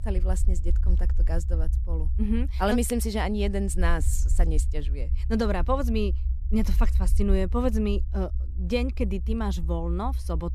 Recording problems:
low rumble; noticeable; throughout; 20 dB below the speech

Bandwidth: 14 kHz